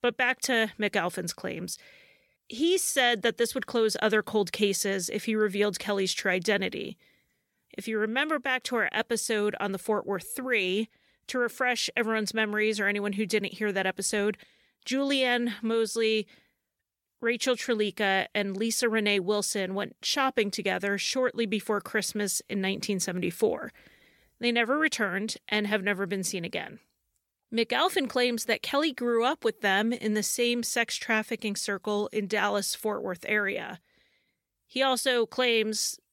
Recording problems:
none

